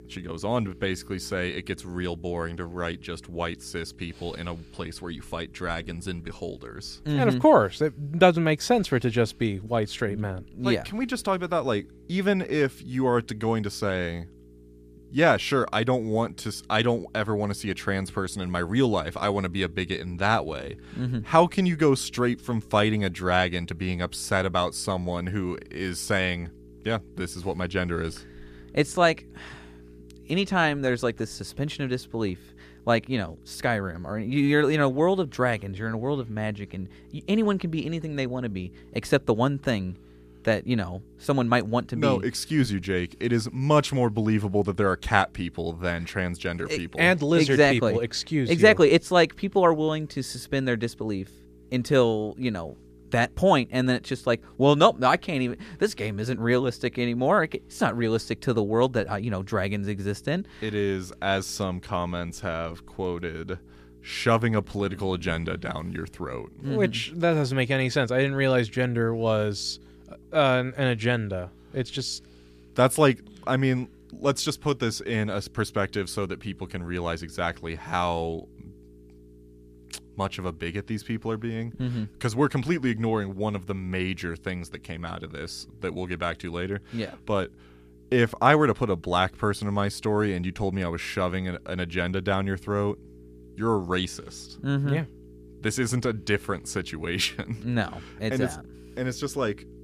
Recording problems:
electrical hum; faint; throughout; 60 Hz, 30 dB below the speech

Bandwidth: 14.5 kHz